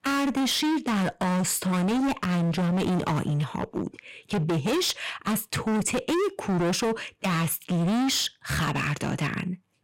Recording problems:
distortion; heavy; 31% of the sound clipped

